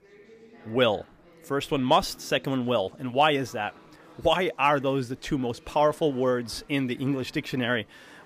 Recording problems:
chatter from many people; faint; throughout; 25 dB below the speech

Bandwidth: 15 kHz